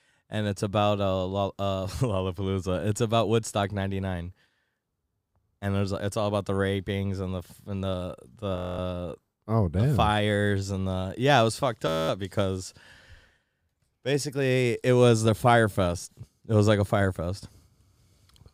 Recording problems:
audio freezing; at 8.5 s and at 12 s

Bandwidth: 15.5 kHz